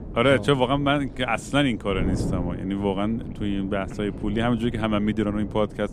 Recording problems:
wind noise on the microphone; occasional gusts; 15 dB below the speech

